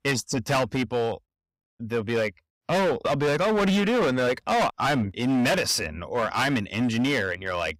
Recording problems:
distortion; heavy; 18% of the sound clipped

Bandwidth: 15.5 kHz